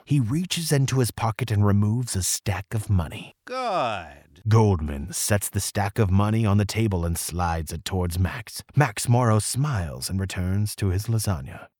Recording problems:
none

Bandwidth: 18.5 kHz